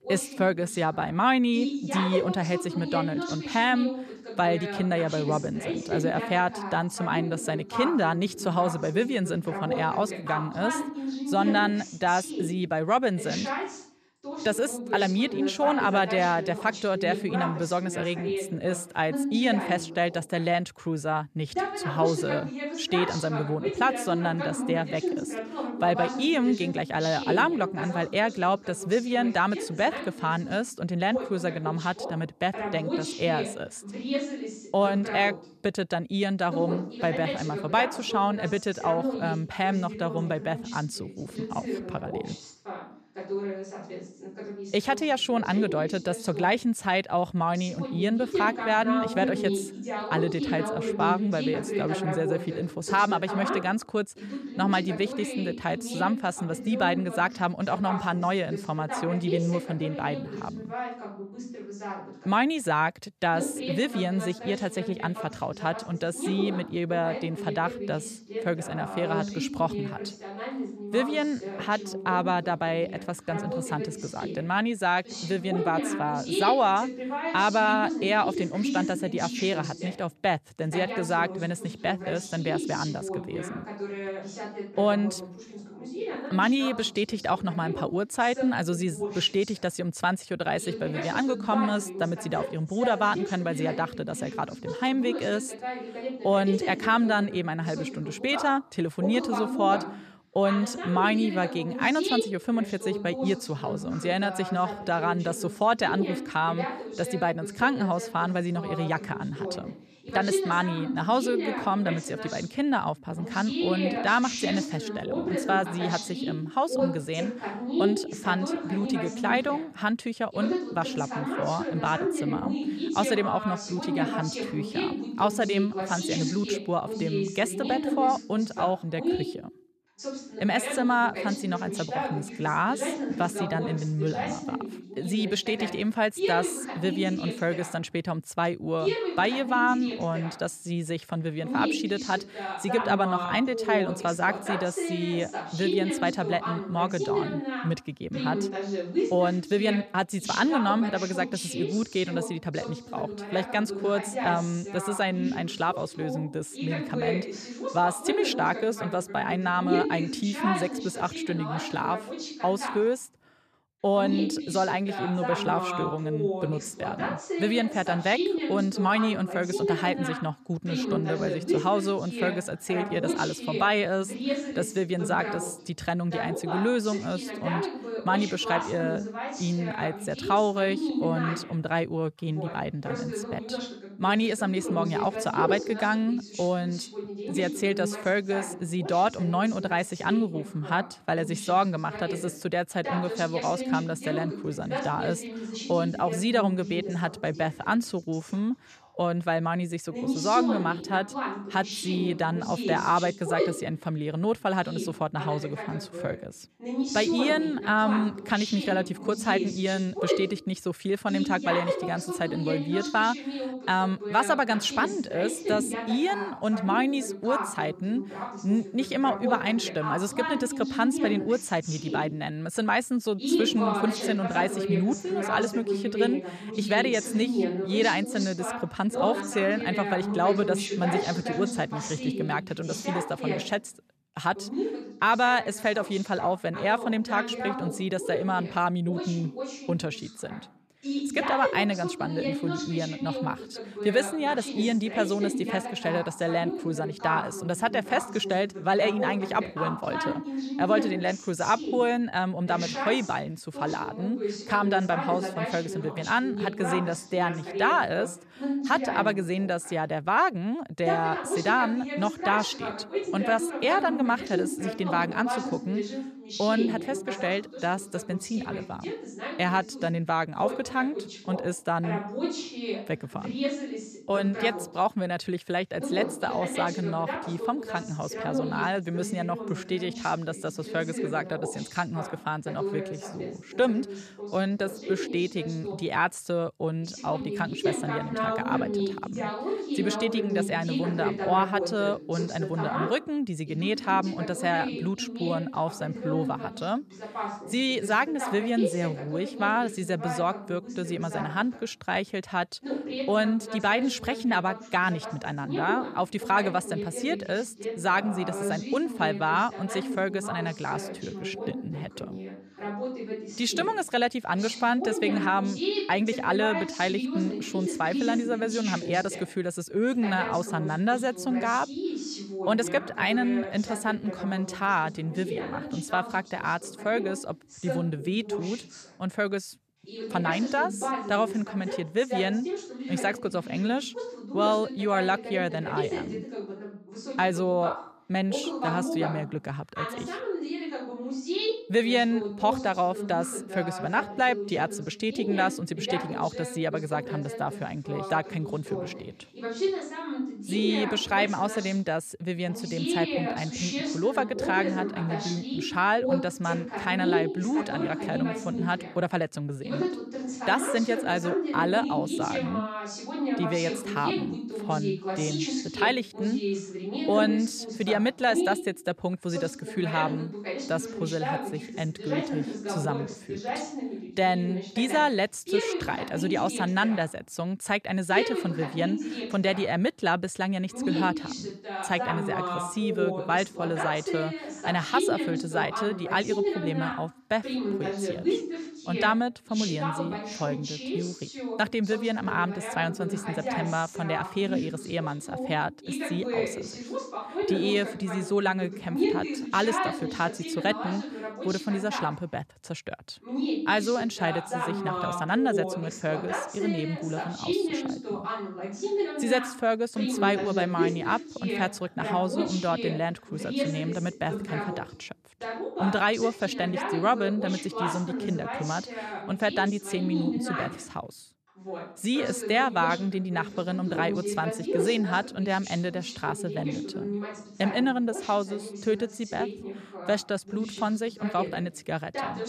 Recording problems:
voice in the background; loud; throughout; 5 dB below the speech

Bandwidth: 14 kHz